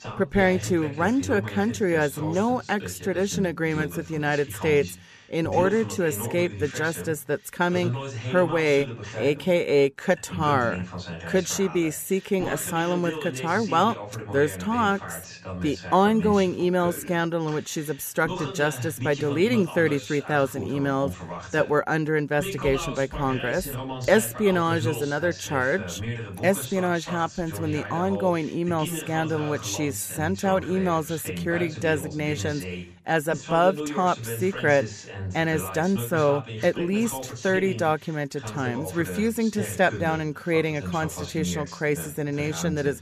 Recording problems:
voice in the background; loud; throughout; 10 dB below the speech

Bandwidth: 14.5 kHz